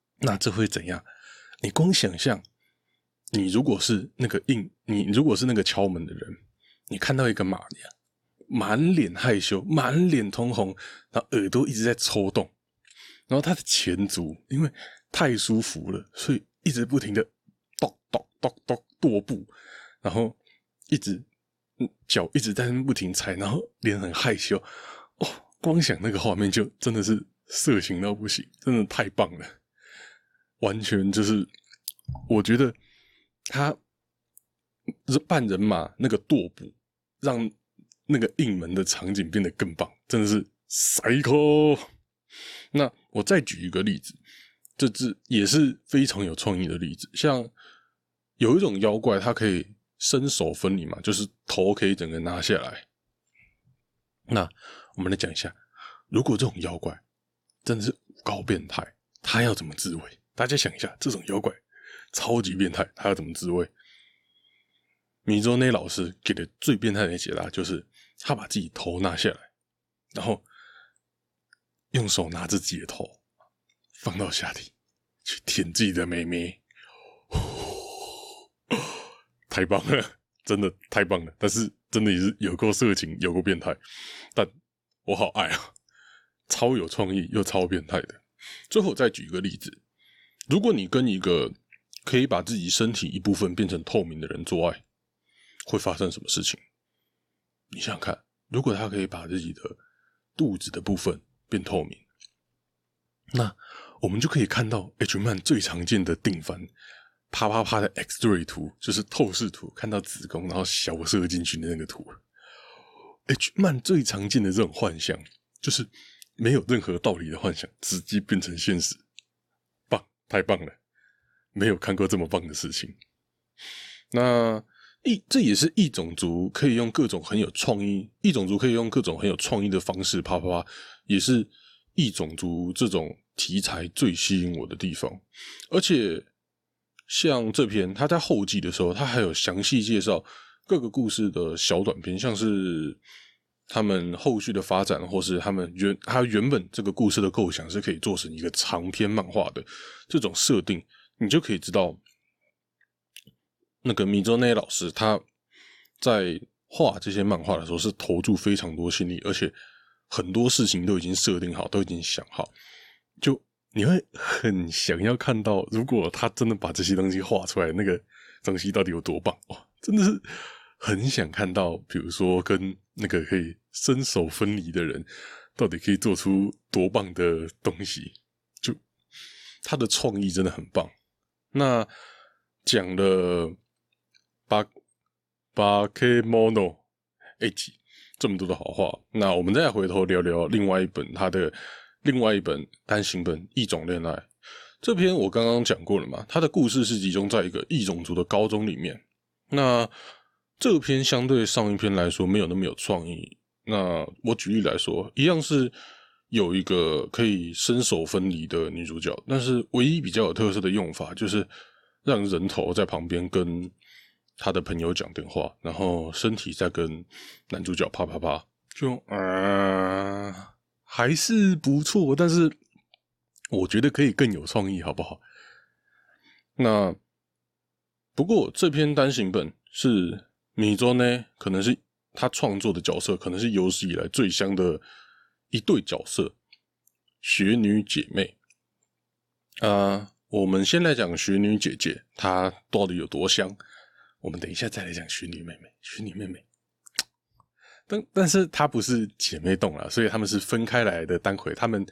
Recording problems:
none

